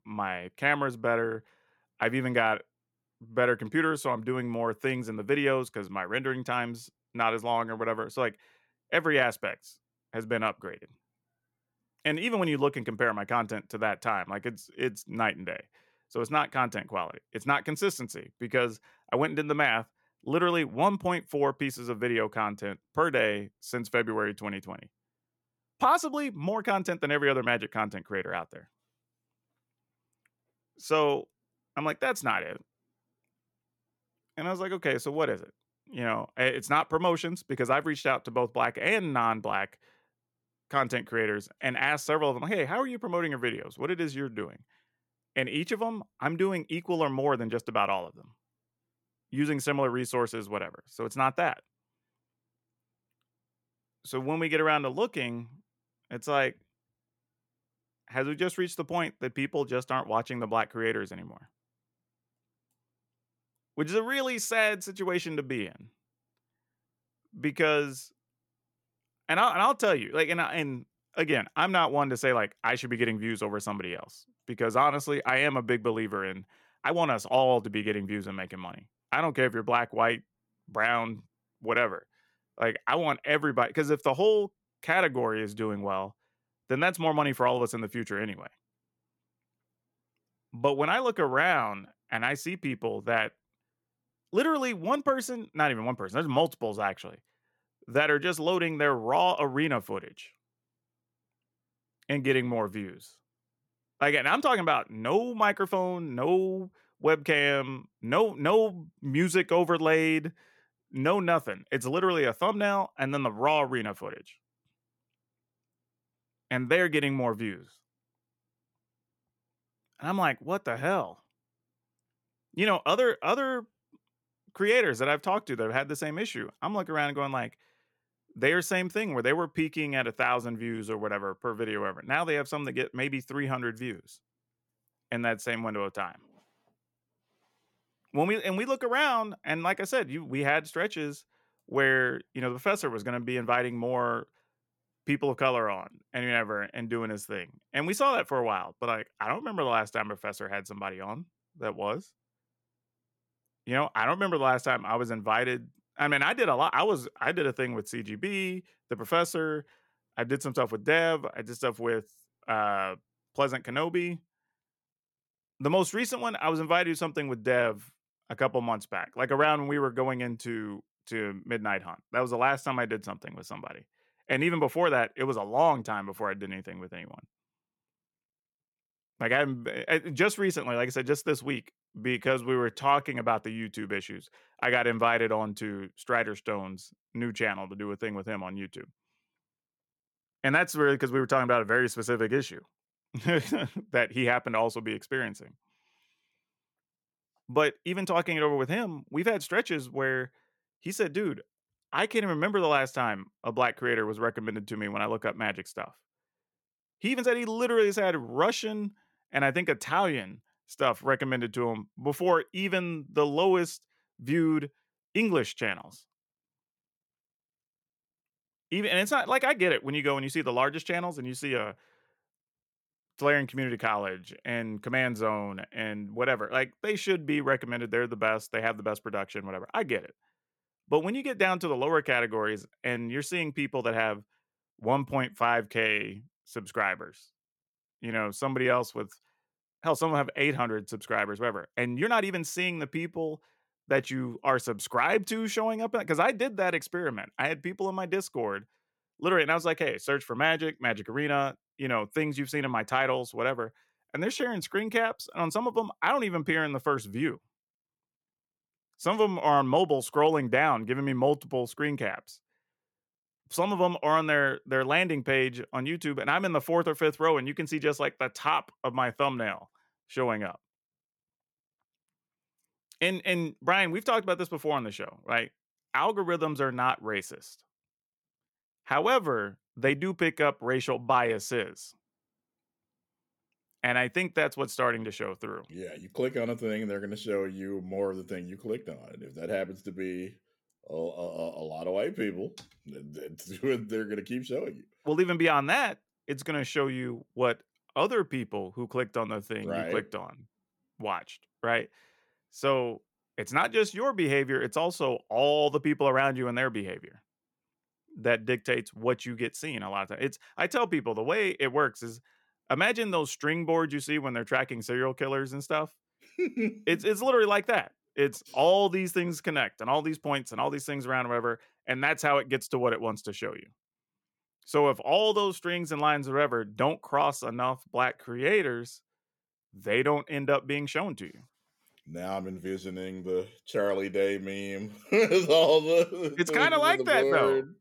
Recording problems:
uneven, jittery; strongly; from 1:17 to 5:29

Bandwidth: 18 kHz